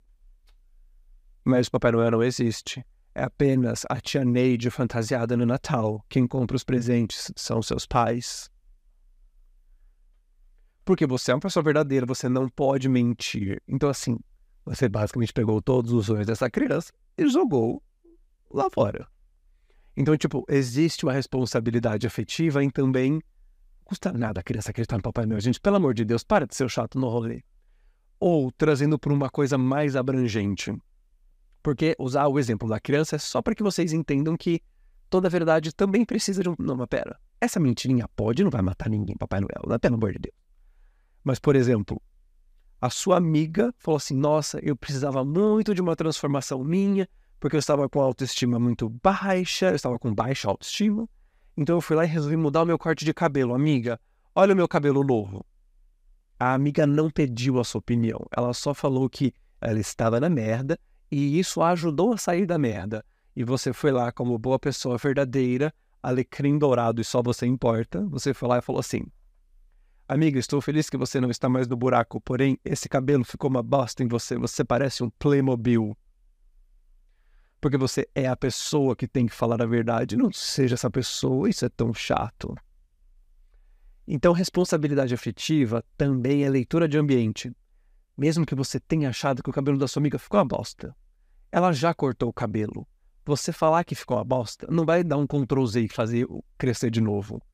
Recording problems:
none

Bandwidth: 15 kHz